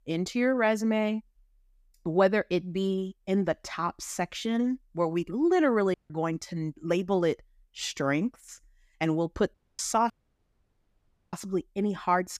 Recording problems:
audio cutting out; at 6 s, at 9.5 s and at 10 s for 1 s

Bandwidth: 14.5 kHz